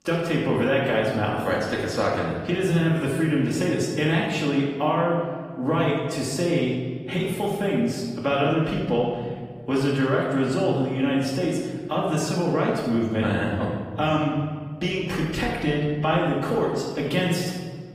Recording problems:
off-mic speech; far
room echo; noticeable; dies away in 1.6 s
garbled, watery; slightly; nothing above 15 kHz

